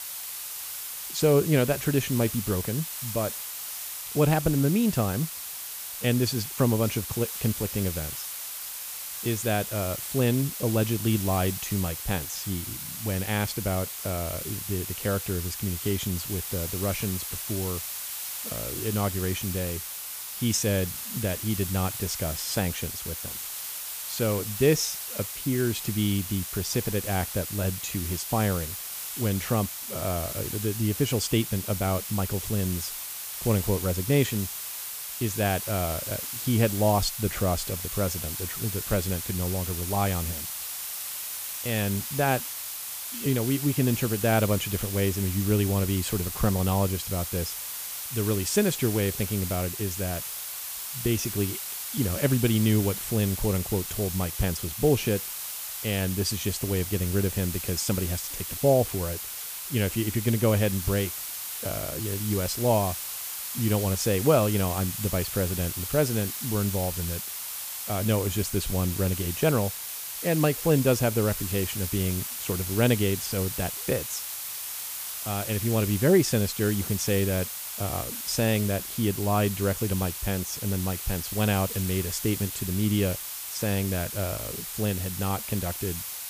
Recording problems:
hiss; loud; throughout; 5 dB below the speech

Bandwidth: 15 kHz